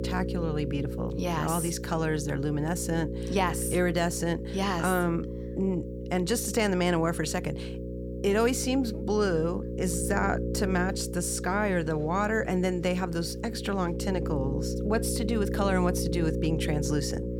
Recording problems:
electrical hum; loud; throughout; 60 Hz, 8 dB below the speech

